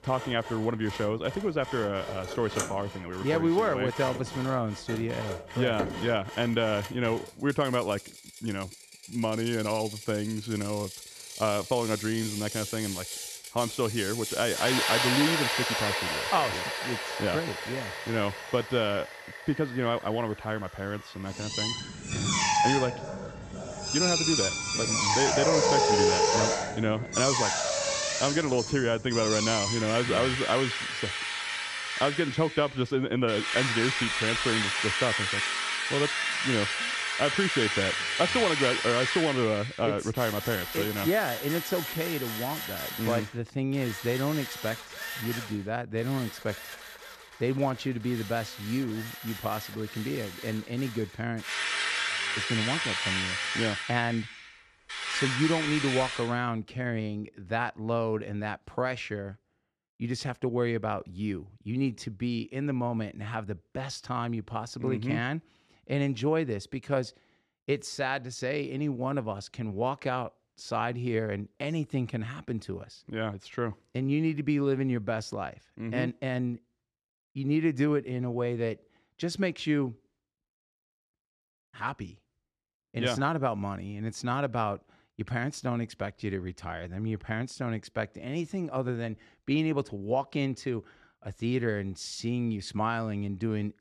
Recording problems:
machinery noise; very loud; until 56 s; 1 dB above the speech

